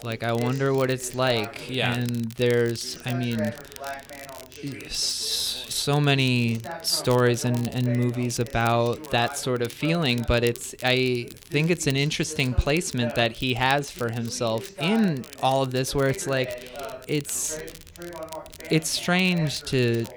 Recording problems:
background chatter; noticeable; throughout; 2 voices, 15 dB below the speech
crackle, like an old record; faint; 20 dB below the speech

